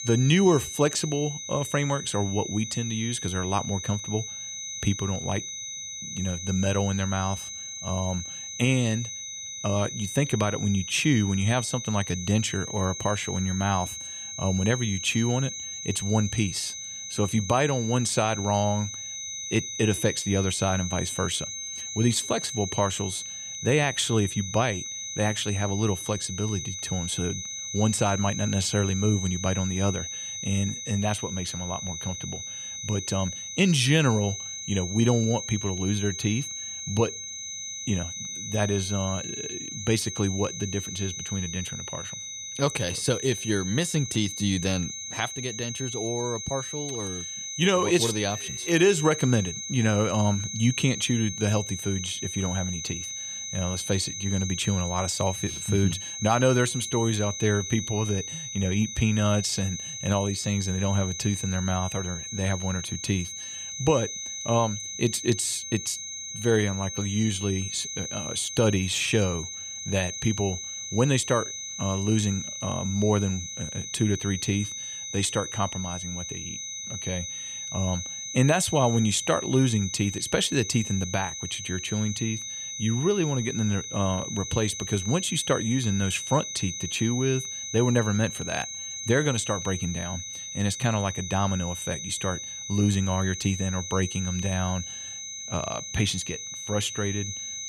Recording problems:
high-pitched whine; loud; throughout; 6 kHz, 6 dB below the speech

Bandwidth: 15 kHz